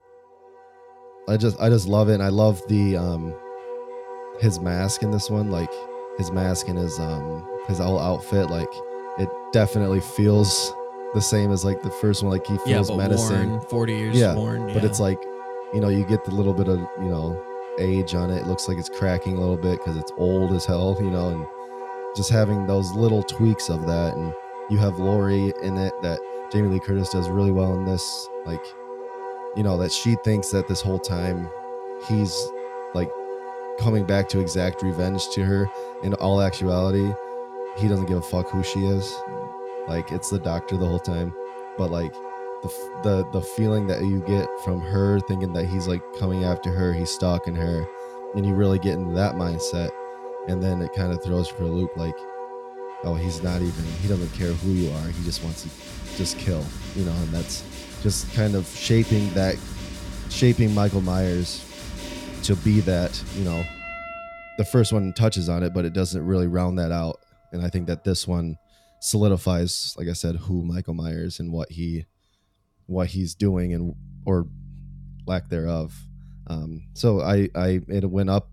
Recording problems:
background music; noticeable; throughout; 10 dB below the speech

